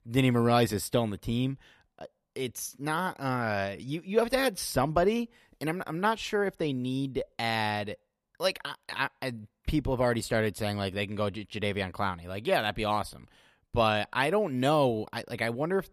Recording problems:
none

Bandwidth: 14.5 kHz